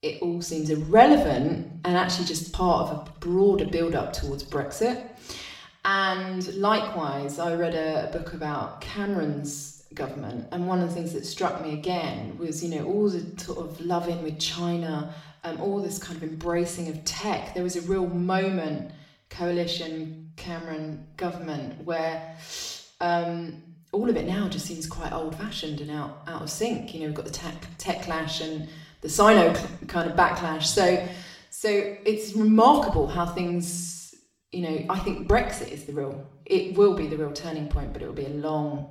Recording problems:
off-mic speech; far
room echo; slight; dies away in 0.7 s

